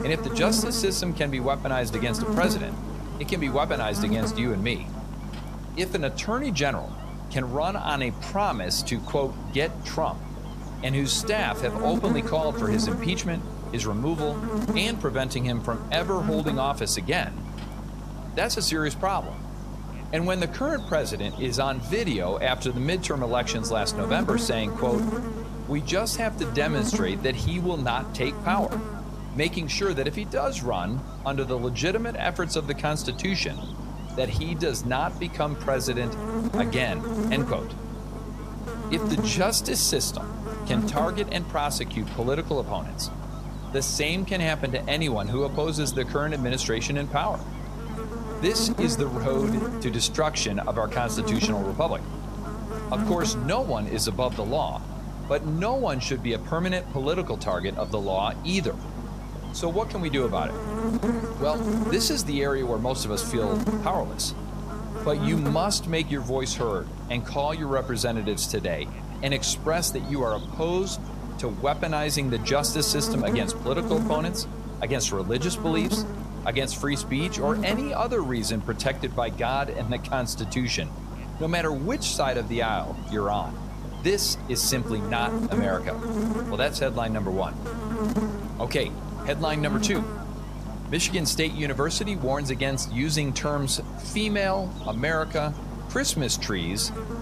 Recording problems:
electrical hum; loud; throughout; 50 Hz, 9 dB below the speech

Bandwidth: 14.5 kHz